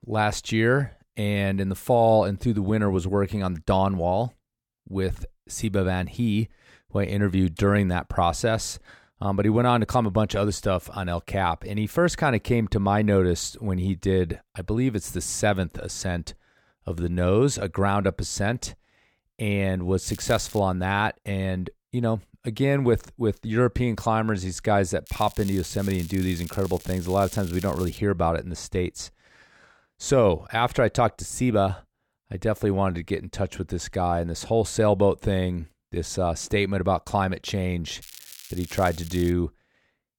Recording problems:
crackling; noticeable; at 20 s, from 25 to 28 s and from 38 to 39 s; 15 dB below the speech

